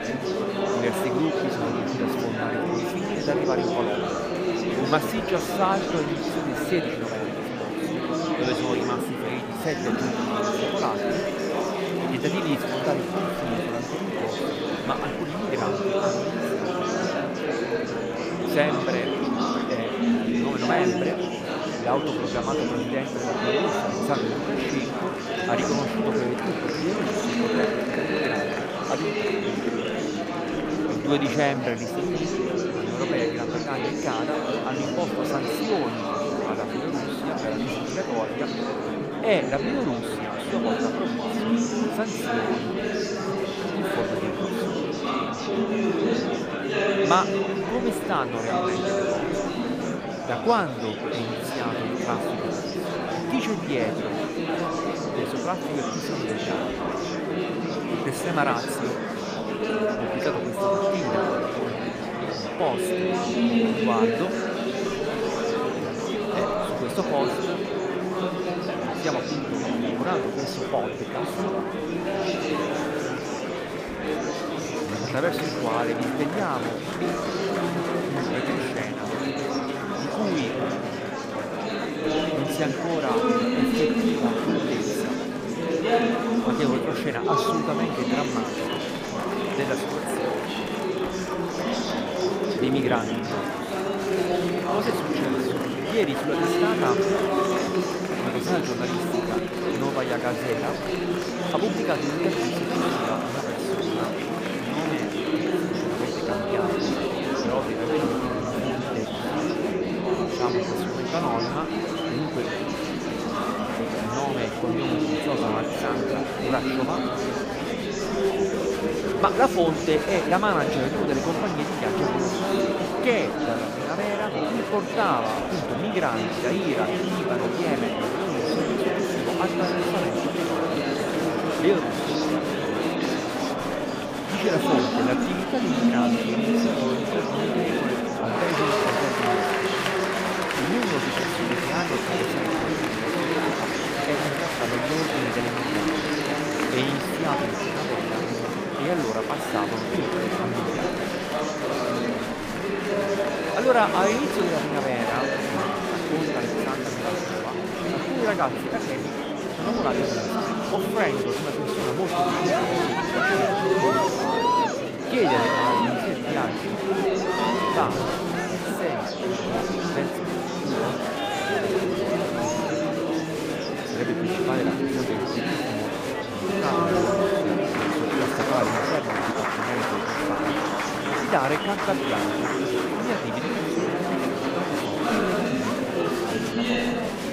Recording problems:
murmuring crowd; very loud; throughout; 4 dB above the speech

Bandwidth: 15 kHz